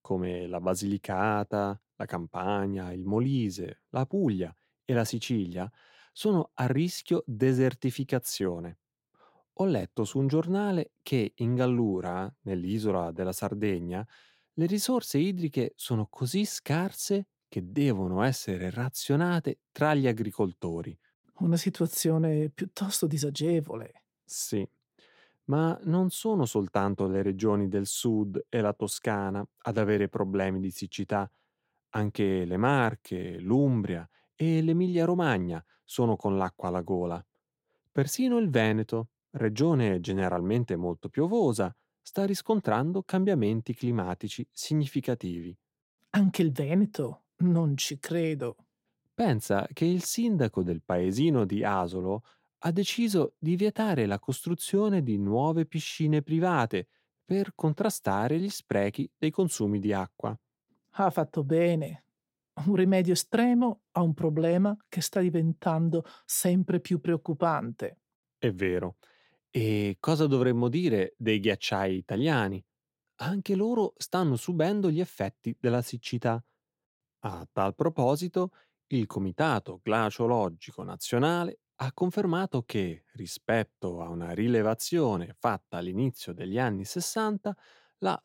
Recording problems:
none

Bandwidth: 16.5 kHz